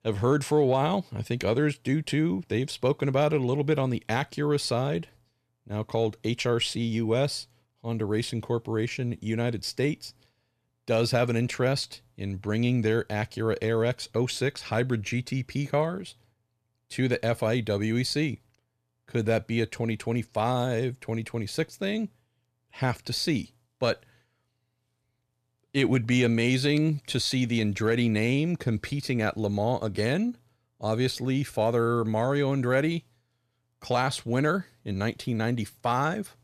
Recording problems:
none

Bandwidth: 14 kHz